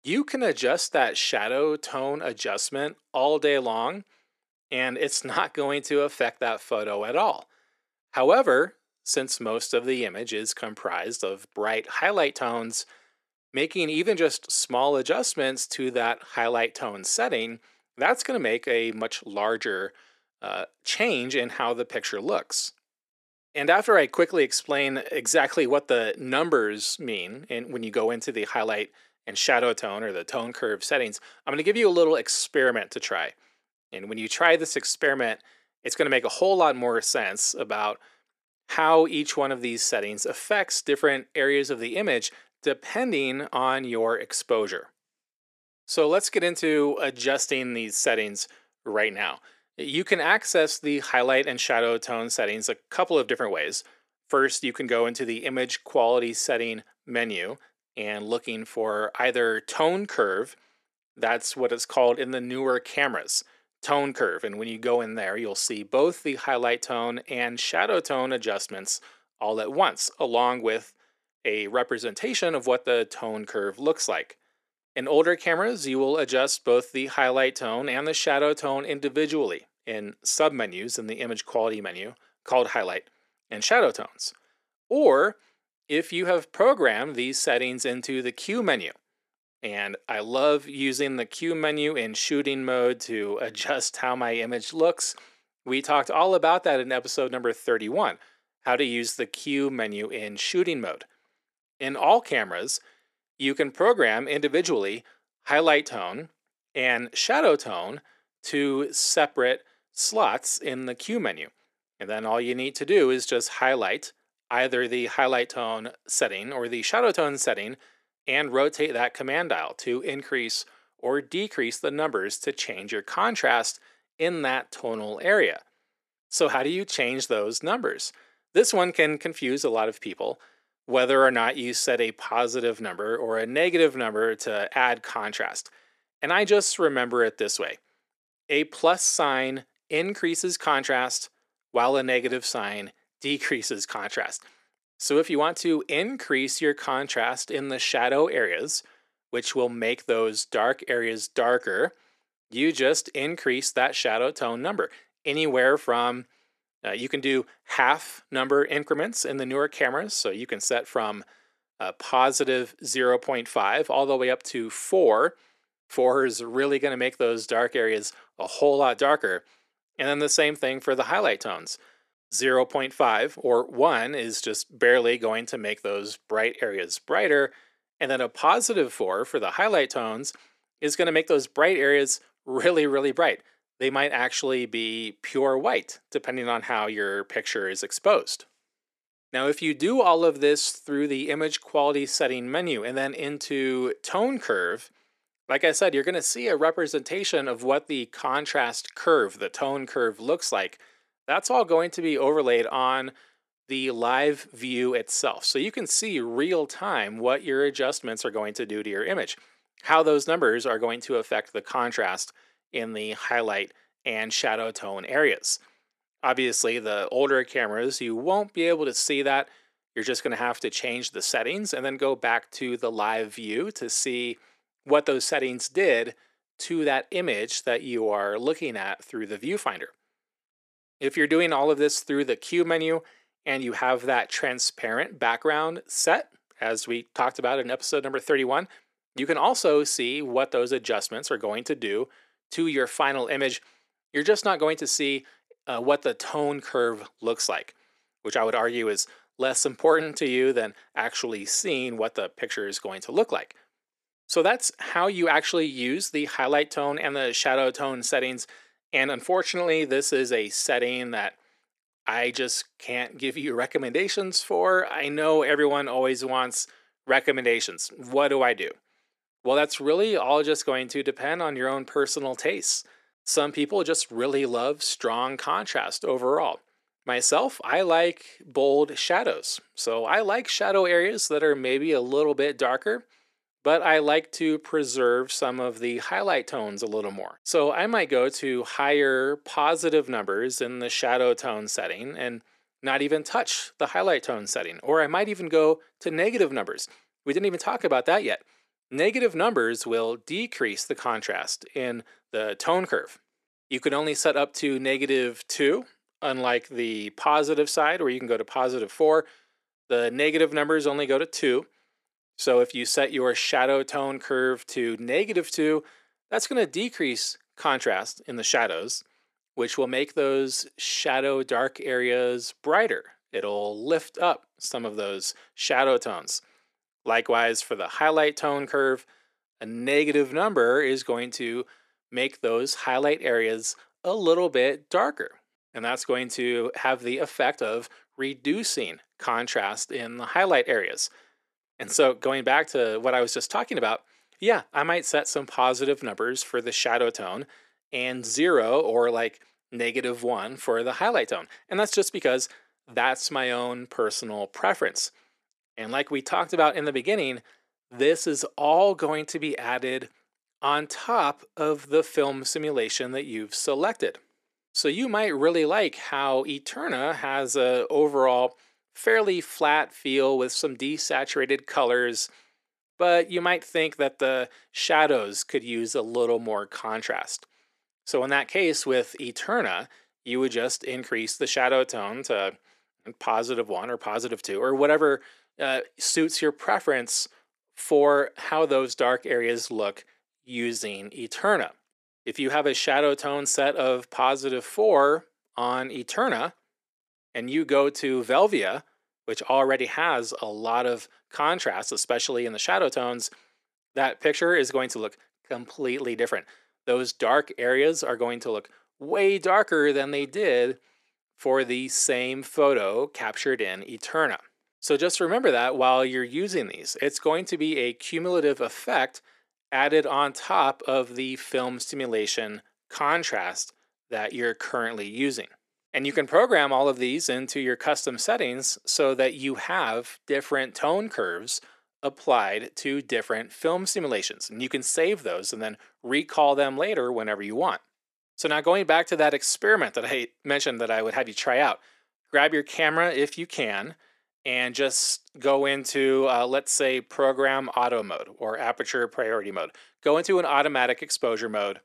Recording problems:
thin; somewhat; fading below 400 Hz

